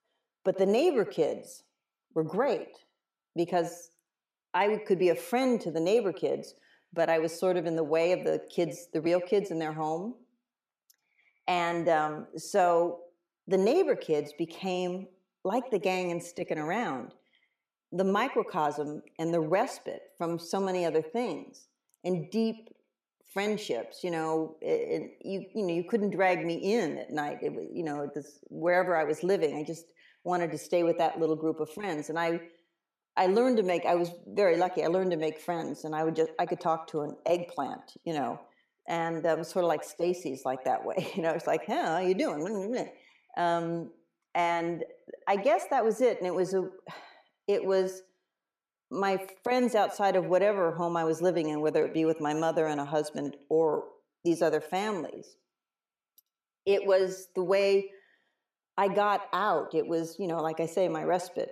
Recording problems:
echo of what is said; noticeable; throughout; 80 ms later, 15 dB below the speech

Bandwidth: 14.5 kHz